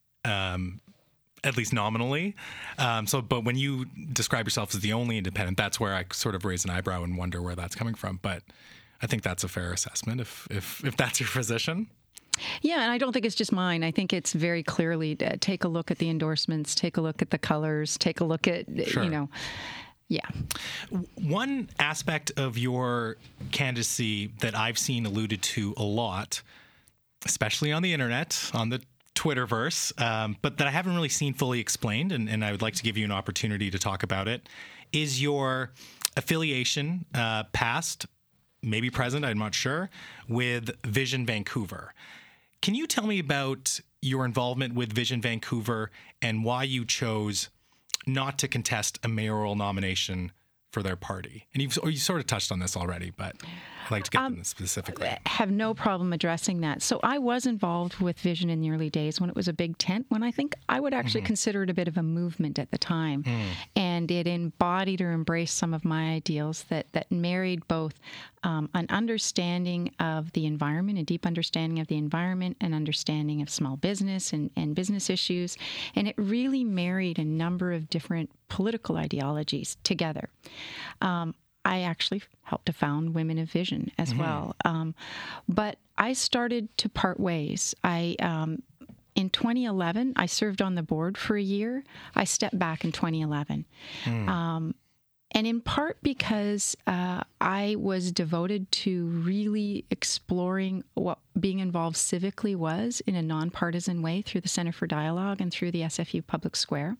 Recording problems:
squashed, flat; heavily

